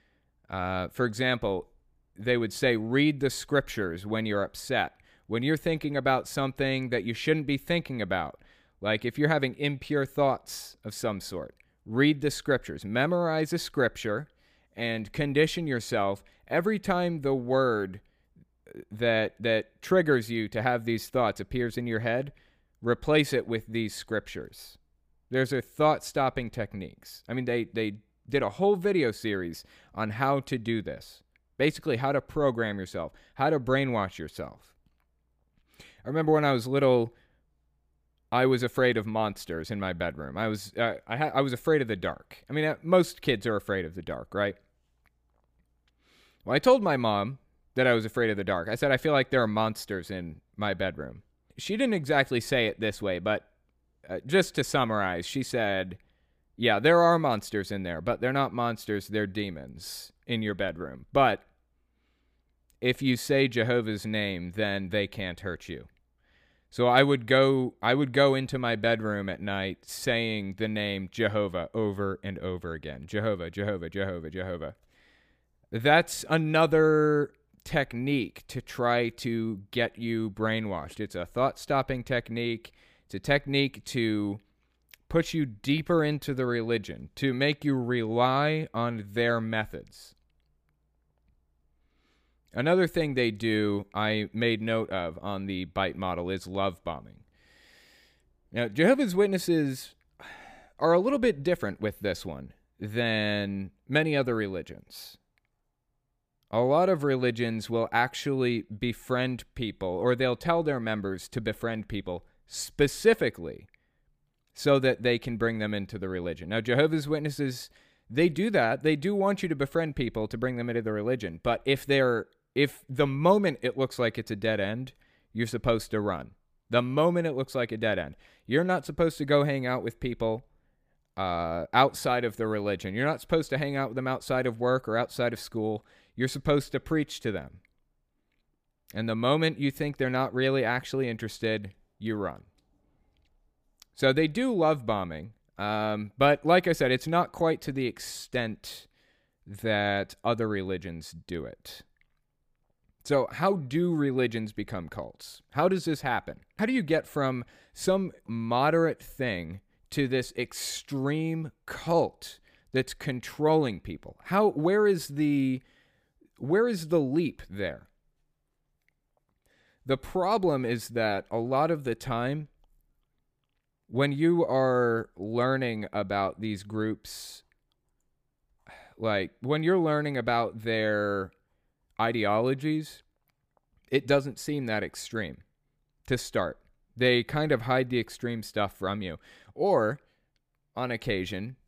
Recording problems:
none

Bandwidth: 15 kHz